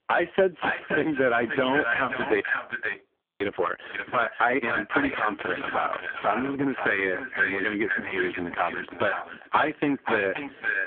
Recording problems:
phone-call audio; poor line
distortion; heavy; 6% of the sound clipped
echo of what is said; strong; throughout; 530 ms later, 4 dB below the speech
squashed, flat; somewhat
audio freezing; at 2.5 s for 1 s

